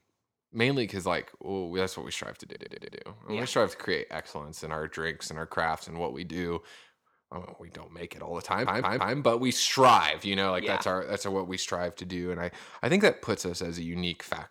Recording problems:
audio stuttering; at 2.5 s and at 8.5 s

